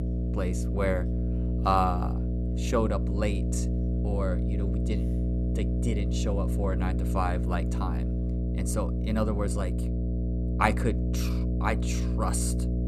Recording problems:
electrical hum; loud; throughout; 60 Hz, 7 dB below the speech

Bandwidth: 14 kHz